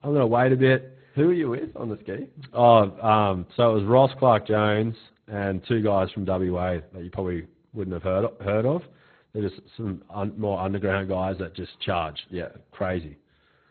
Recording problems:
garbled, watery; badly; nothing above 4 kHz

